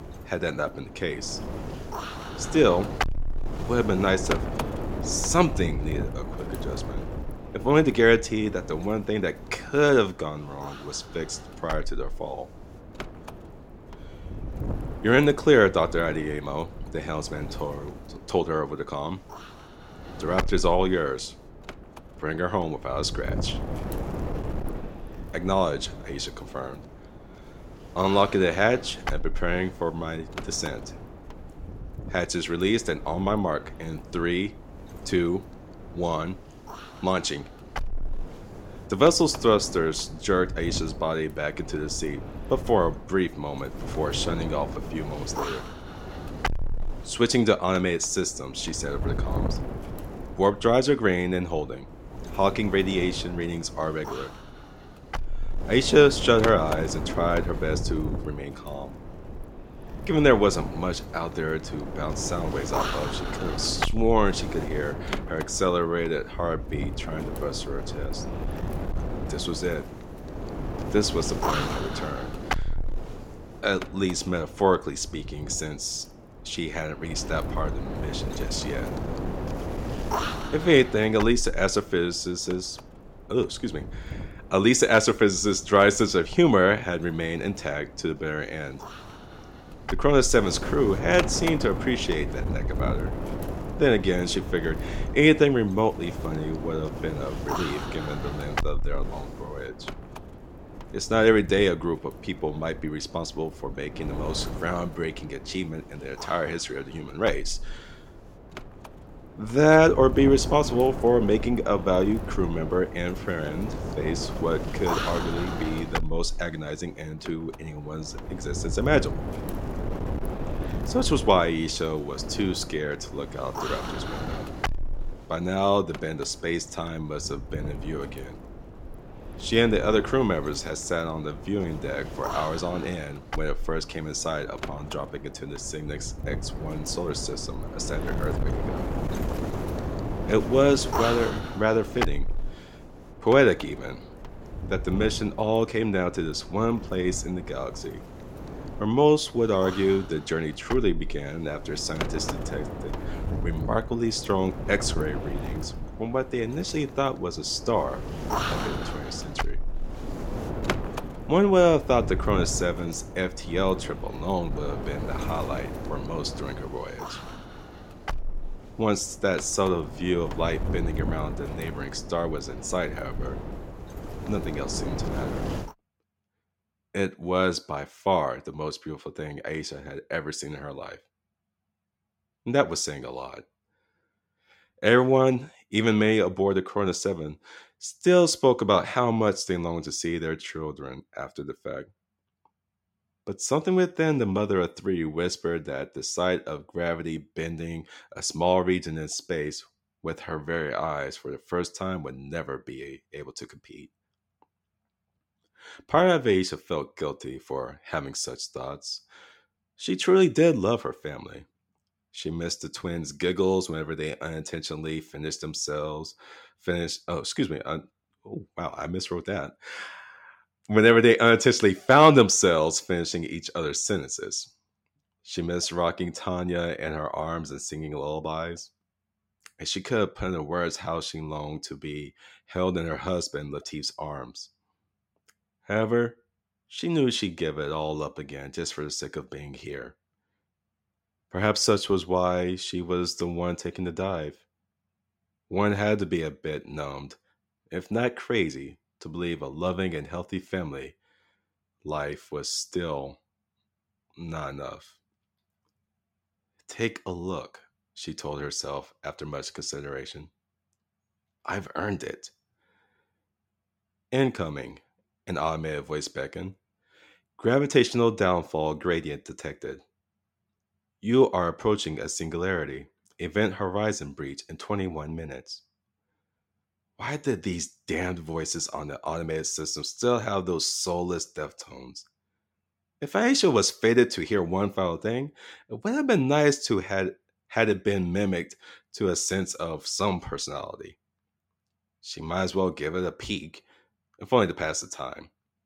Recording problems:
wind noise on the microphone; occasional gusts; until 2:56; 10 dB below the speech

